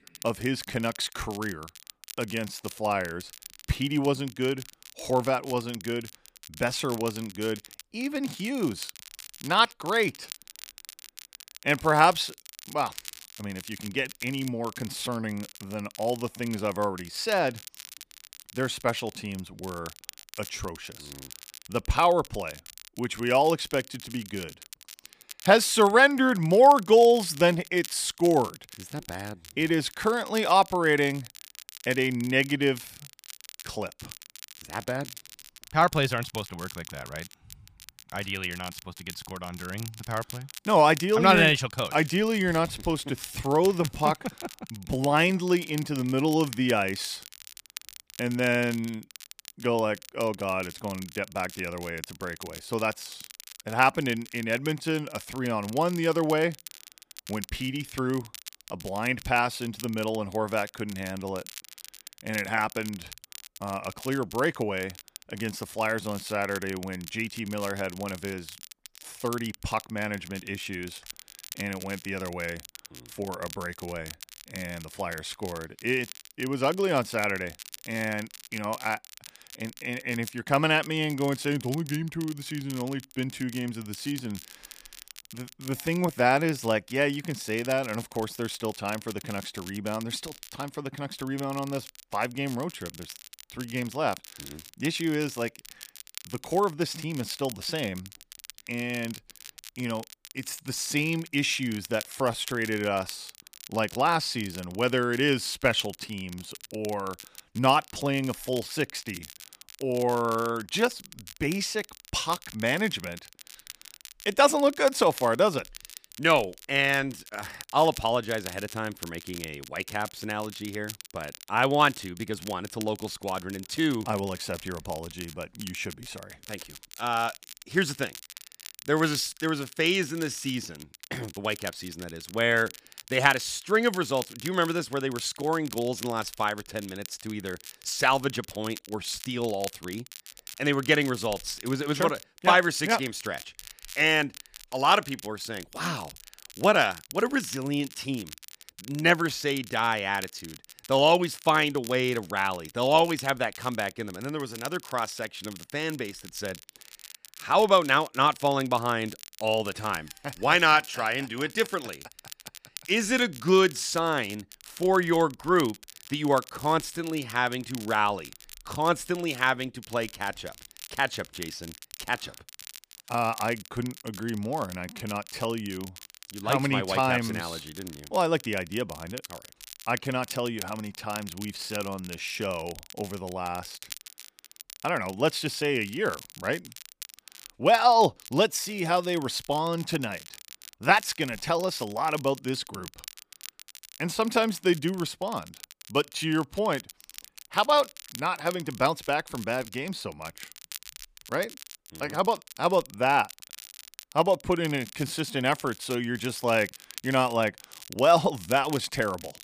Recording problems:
crackle, like an old record; noticeable; 15 dB below the speech

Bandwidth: 15 kHz